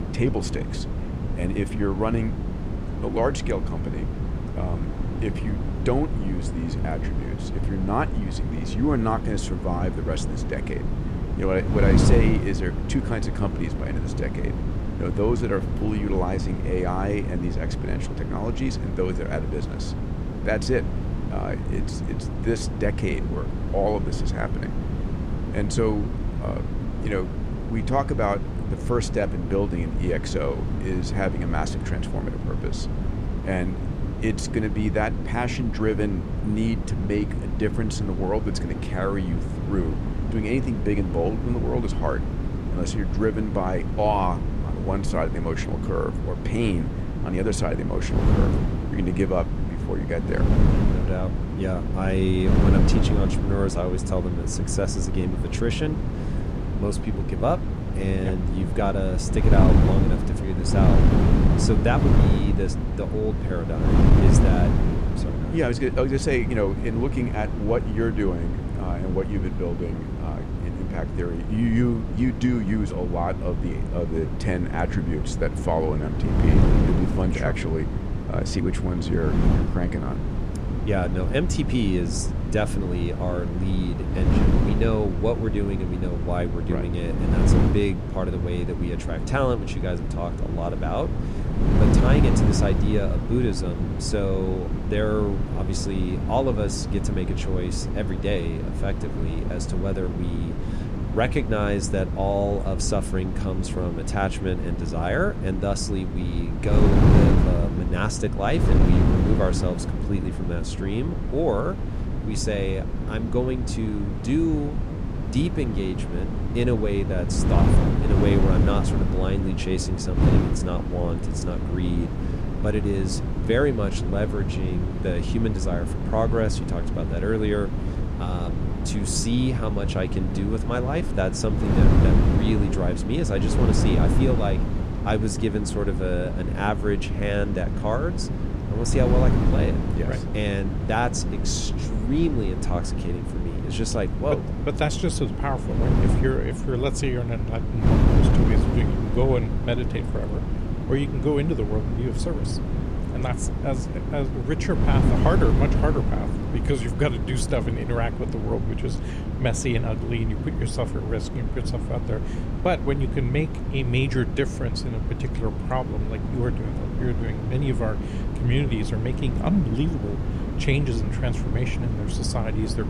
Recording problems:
wind noise on the microphone; heavy; 5 dB below the speech

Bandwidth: 14.5 kHz